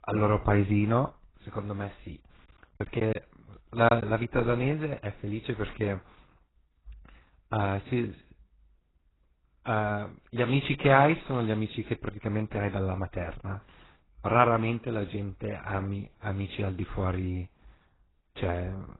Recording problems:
garbled, watery; badly; nothing above 4 kHz
choppy; very; from 2.5 to 4 s; 7% of the speech affected

